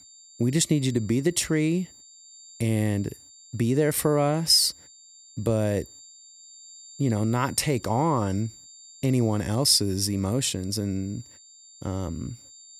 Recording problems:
high-pitched whine; faint; throughout; 7.5 kHz, 20 dB below the speech

